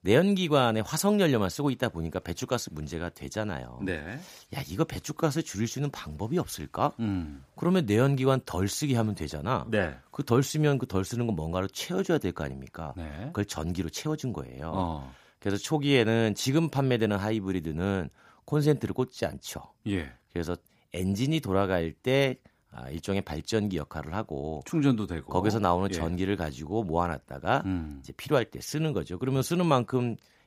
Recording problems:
none

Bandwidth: 15 kHz